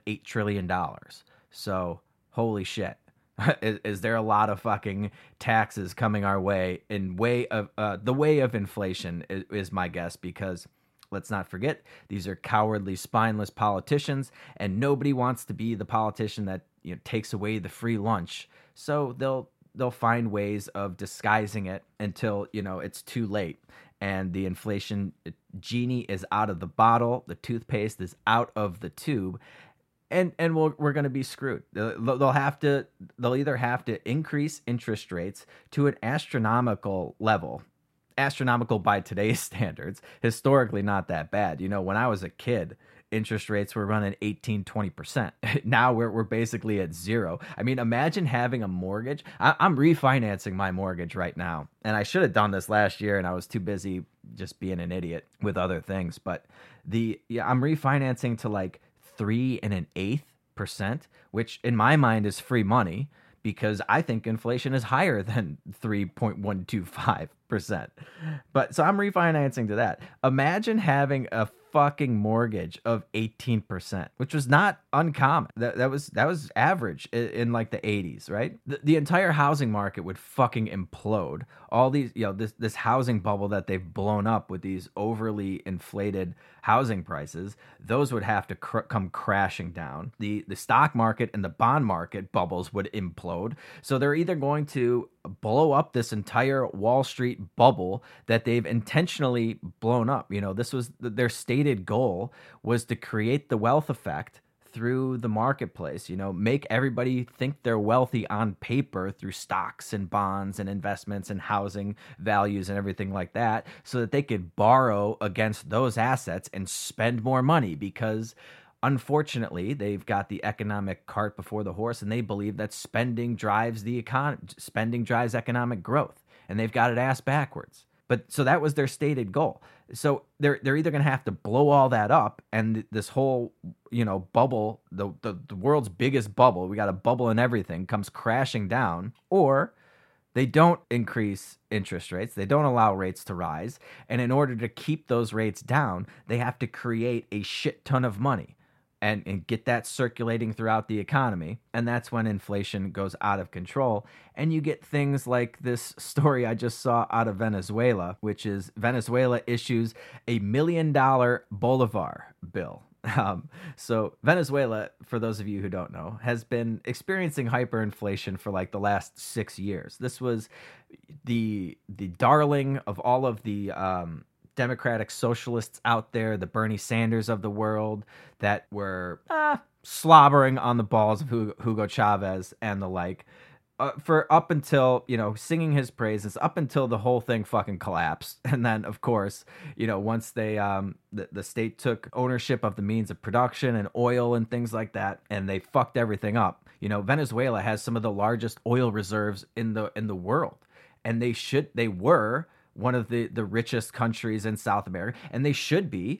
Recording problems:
muffled; slightly; fading above 2.5 kHz

